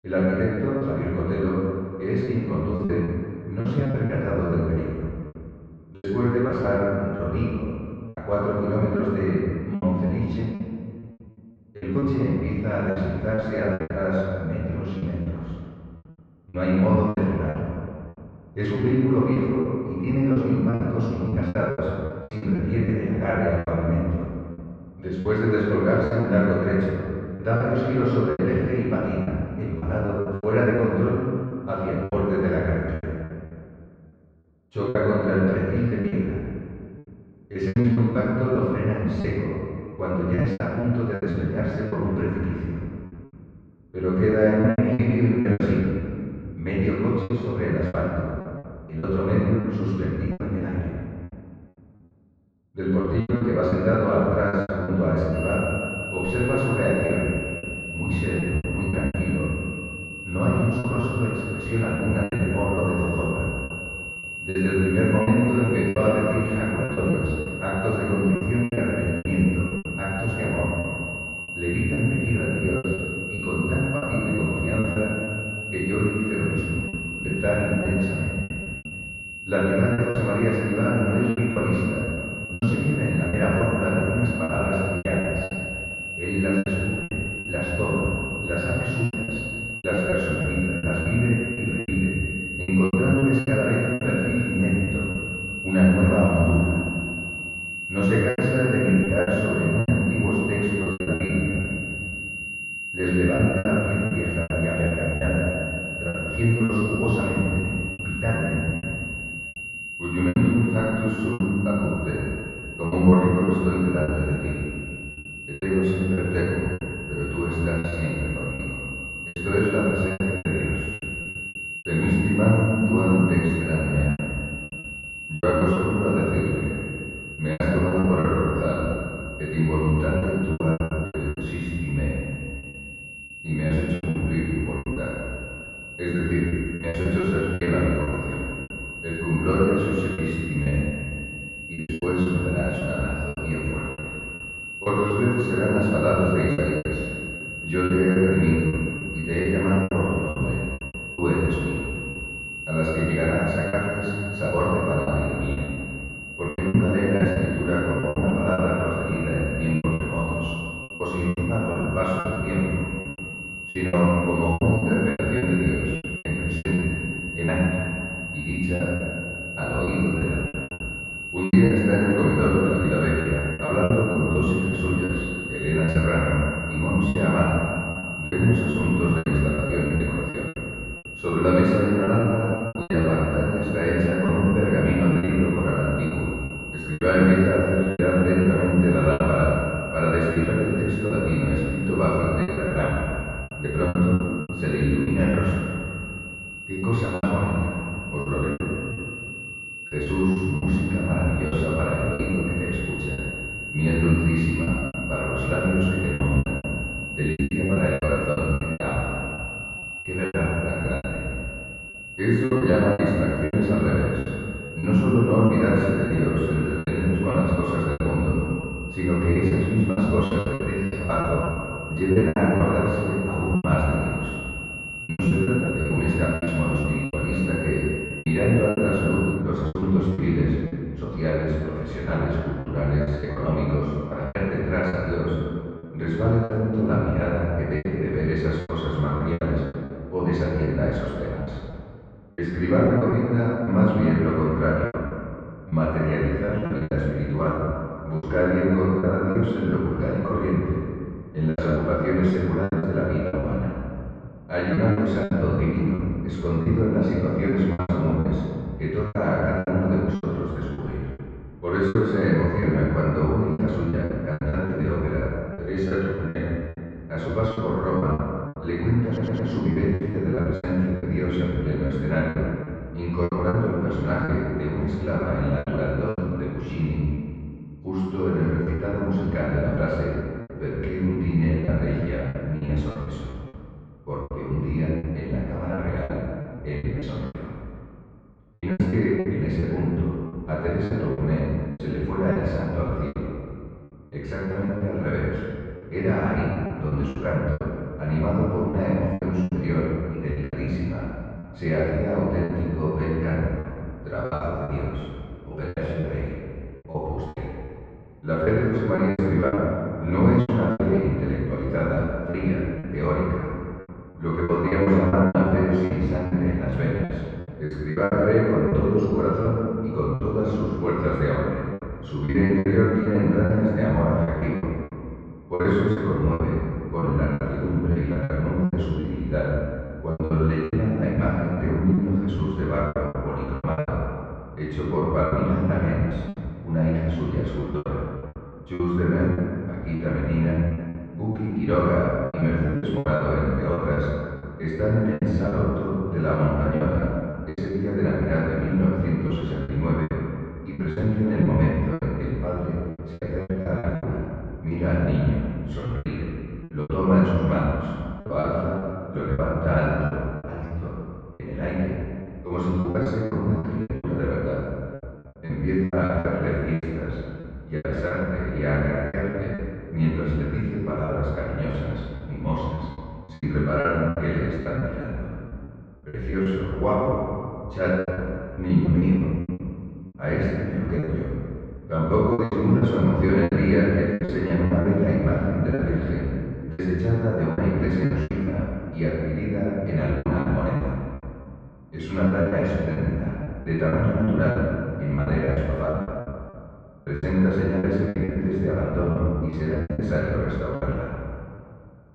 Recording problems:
room echo; strong; dies away in 2 s
off-mic speech; far
muffled; very; fading above 3.5 kHz
high-pitched whine; loud; from 55 s to 3:49; 2.5 kHz, 8 dB below the speech
choppy; very; 12% of the speech affected
audio stuttering; at 4:29

